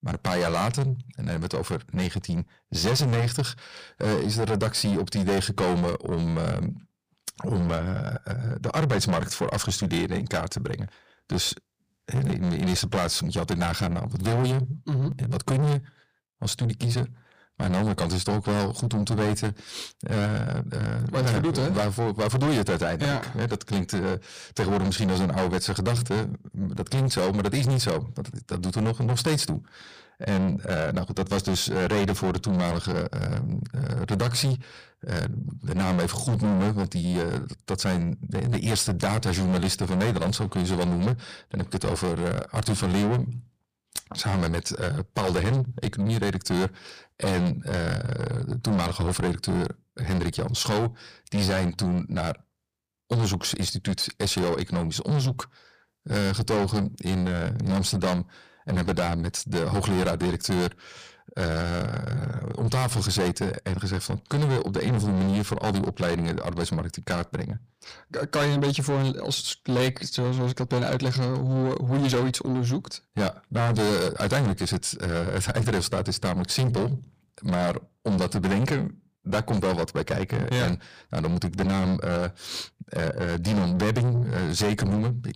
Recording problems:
distortion; heavy; 6 dB below the speech

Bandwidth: 15 kHz